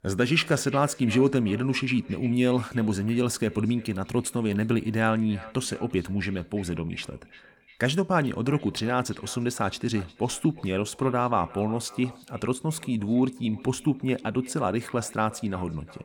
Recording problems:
echo of what is said; faint; throughout; 350 ms later, 20 dB below the speech

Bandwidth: 17.5 kHz